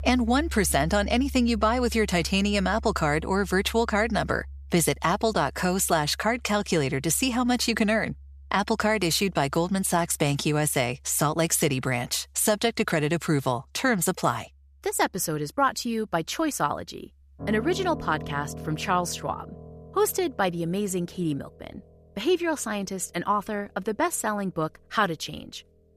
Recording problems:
background music; noticeable; throughout; 15 dB below the speech

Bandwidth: 14.5 kHz